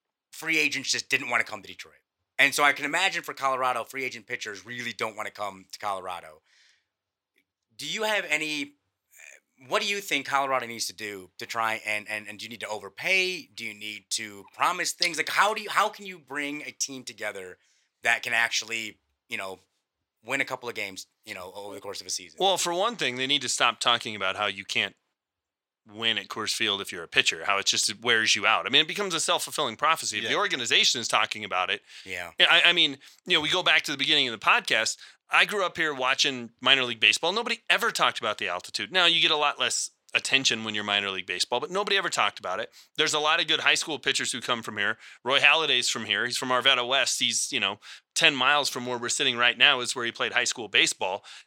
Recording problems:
thin; somewhat; fading below 1 kHz

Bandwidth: 16.5 kHz